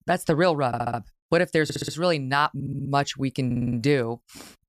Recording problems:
audio stuttering; 4 times, first at 0.5 s

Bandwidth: 14.5 kHz